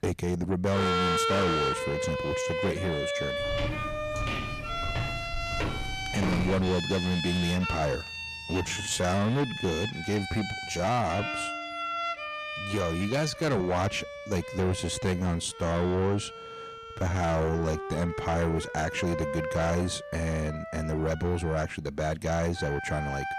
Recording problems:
distortion; heavy; 8 dB below the speech
background music; loud; throughout; 4 dB below the speech
footsteps; noticeable; from 3.5 to 6.5 s; peak level with the speech
uneven, jittery; strongly; from 8.5 to 18 s

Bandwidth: 14.5 kHz